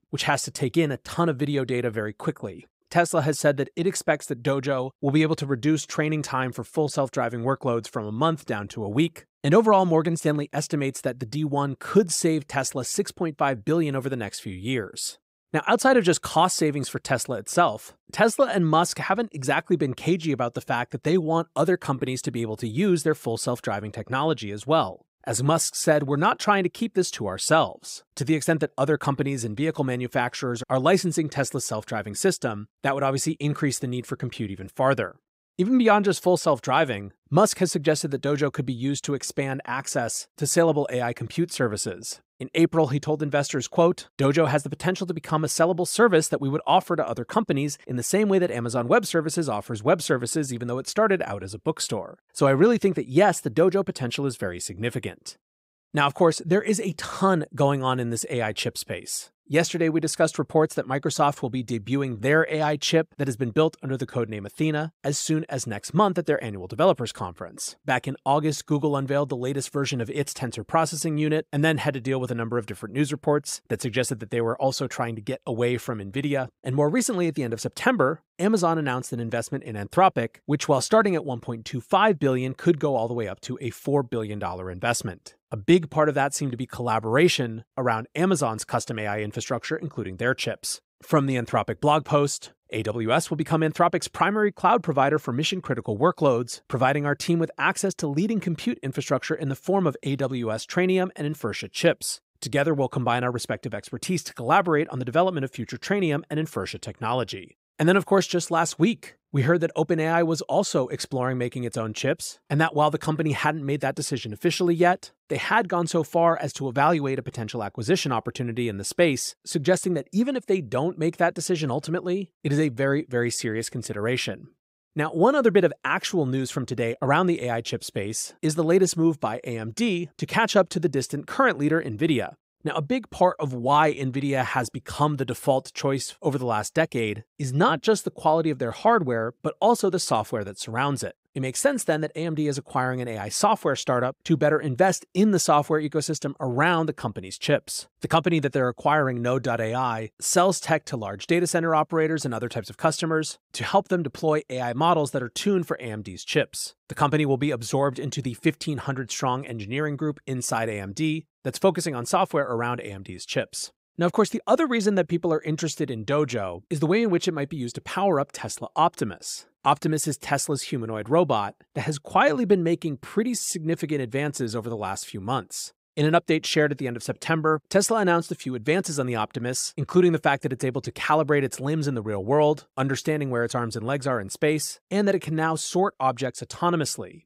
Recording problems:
none

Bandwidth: 15.5 kHz